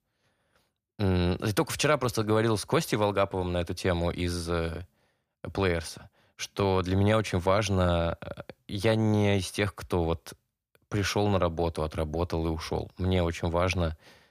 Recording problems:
none

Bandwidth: 15 kHz